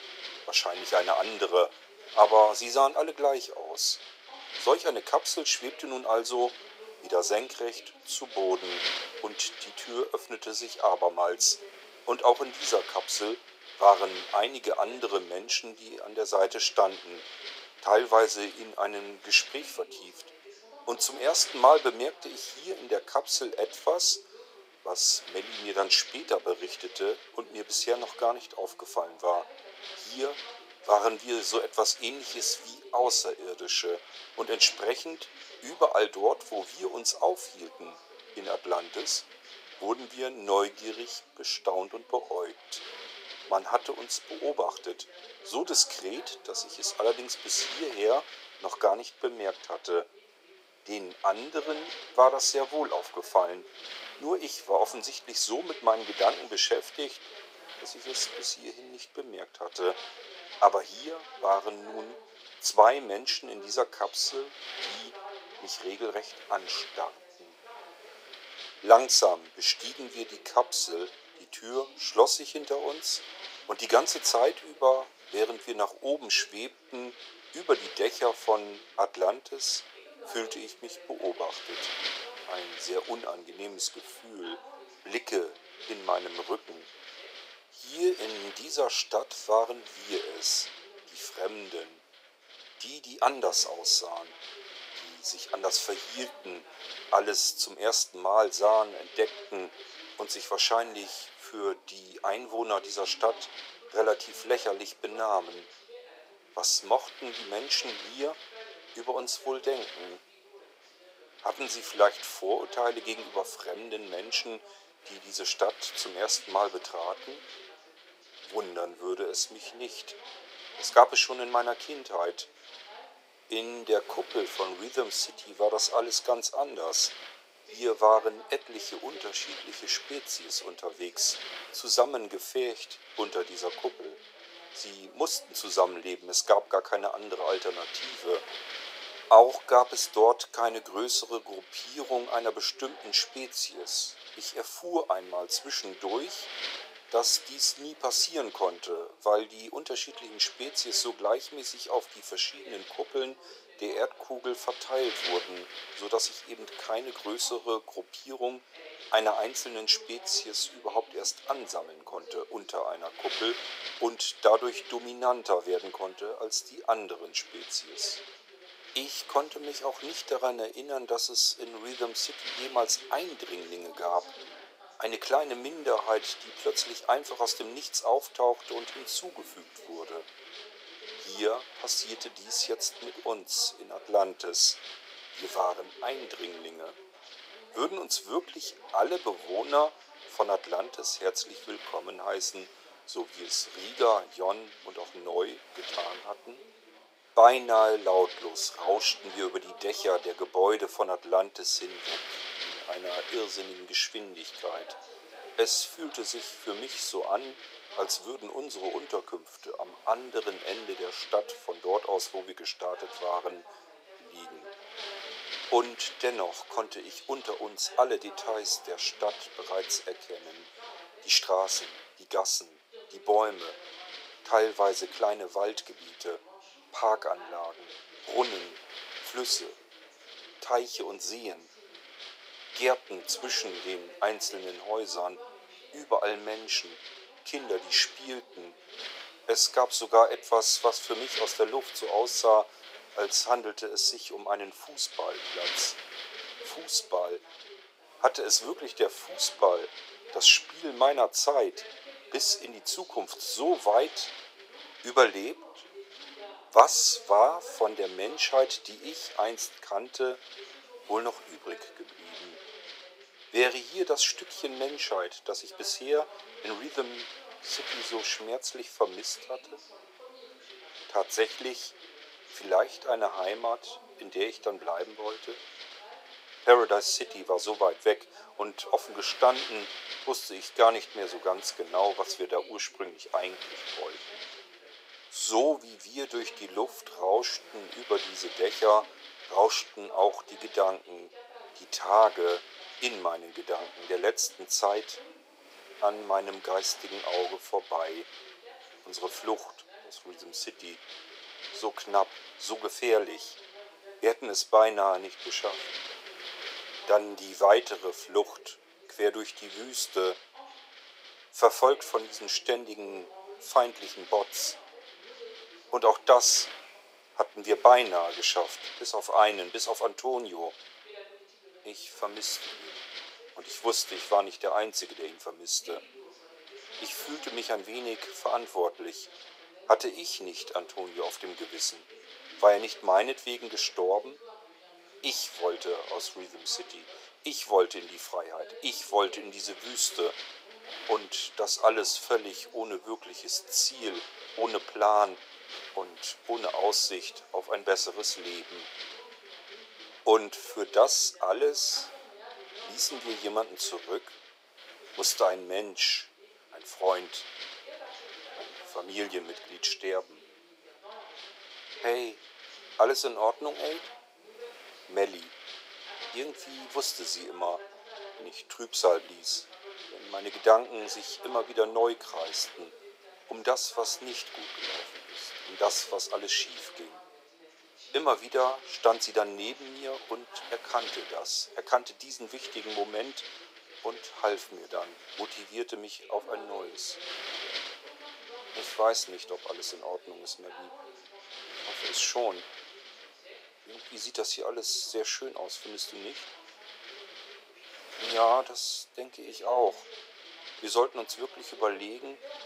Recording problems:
thin; very; fading below 450 Hz
wind noise on the microphone; occasional gusts; 15 dB below the speech
voice in the background; faint; throughout; 25 dB below the speech

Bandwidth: 15.5 kHz